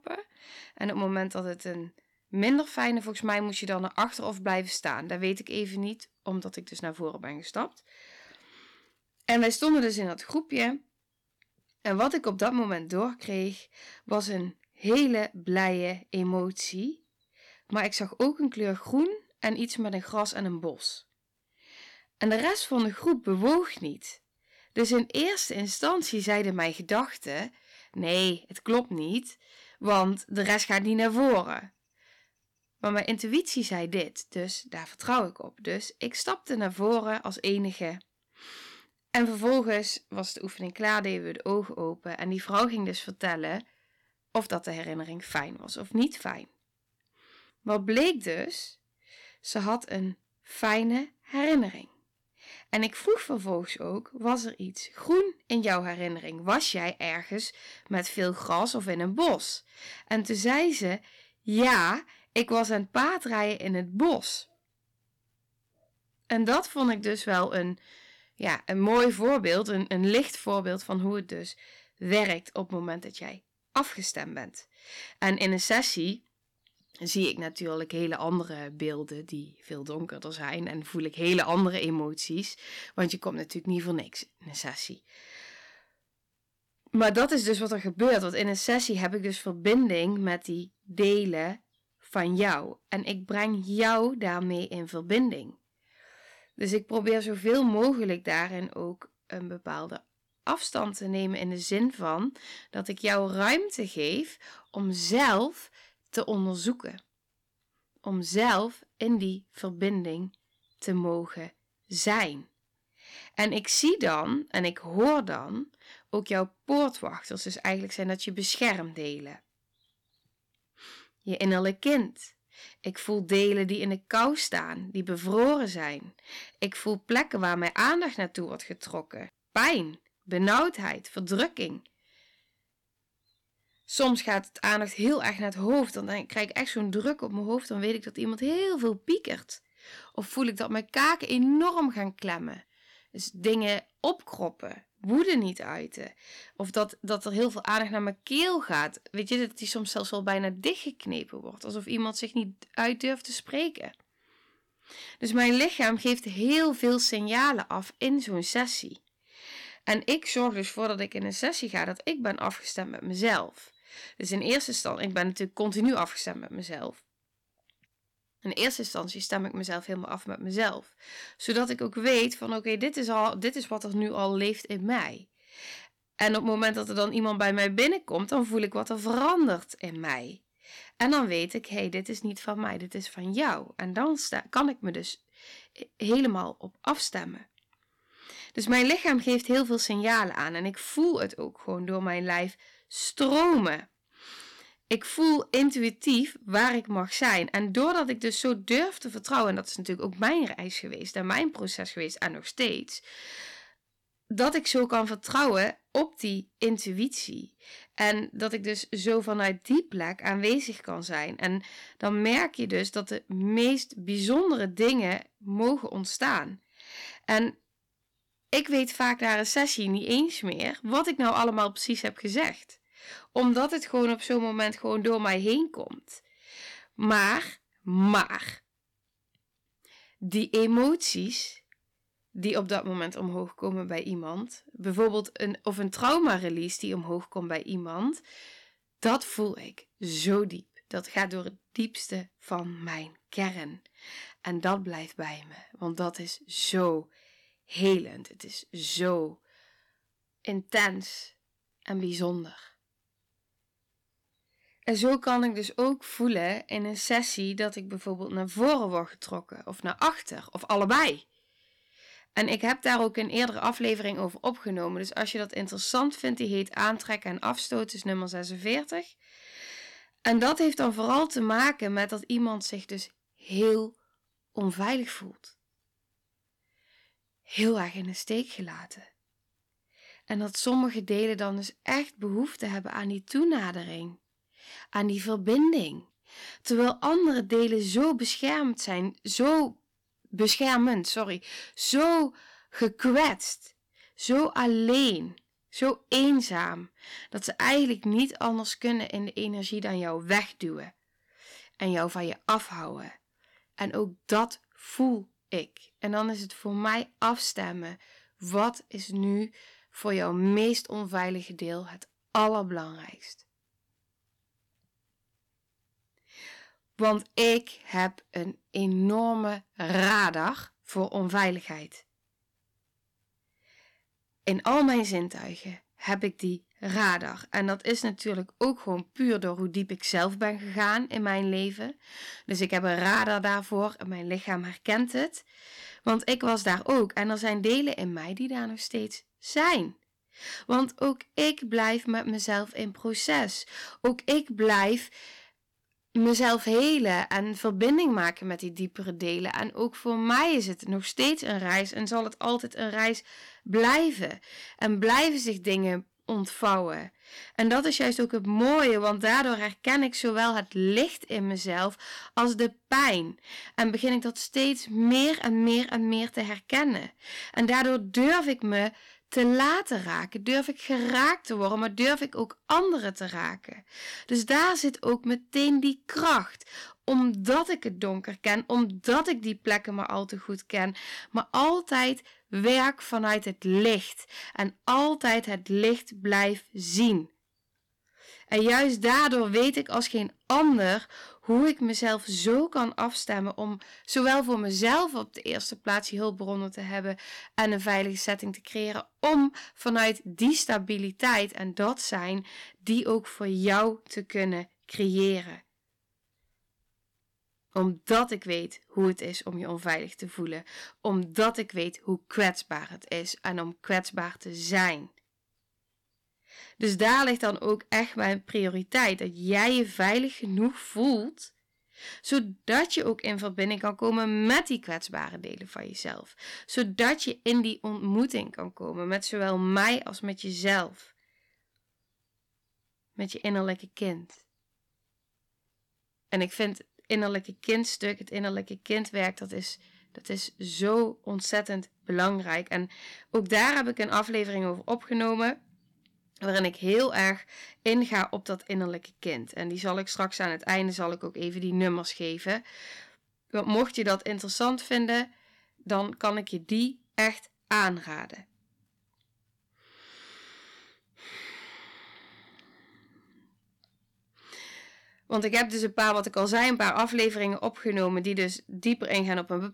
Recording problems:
distortion; slight; 2% of the sound clipped

